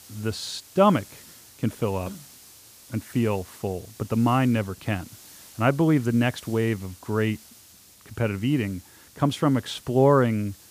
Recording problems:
hiss; faint; throughout; 20 dB below the speech

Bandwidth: 15 kHz